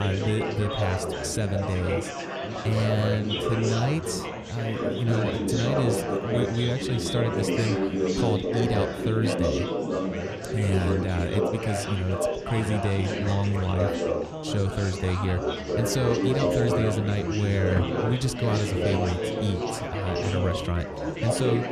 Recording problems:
chatter from many people; loud; throughout; as loud as the speech
household noises; noticeable; from 16 s on; 15 dB below the speech
abrupt cut into speech; at the start

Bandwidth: 14 kHz